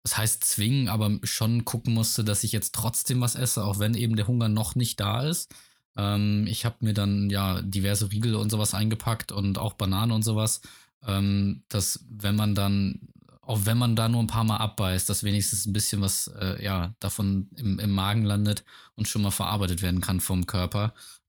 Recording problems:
none

